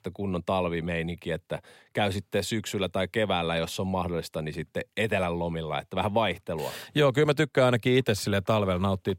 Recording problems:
none

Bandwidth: 16 kHz